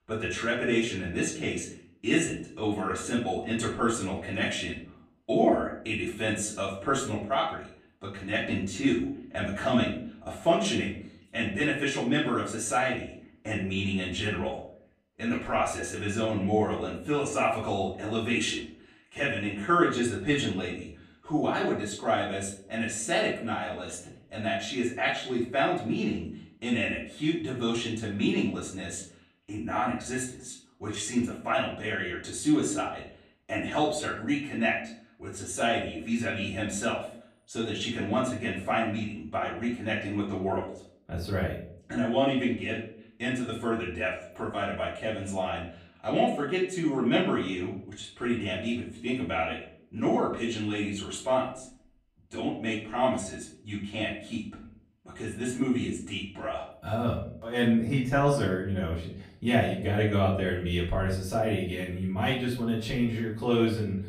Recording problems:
off-mic speech; far
room echo; slight; dies away in 0.5 s

